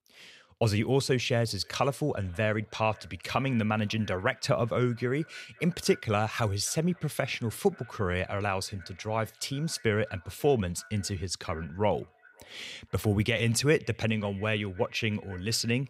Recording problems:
echo of what is said; faint; throughout; 530 ms later, 25 dB below the speech

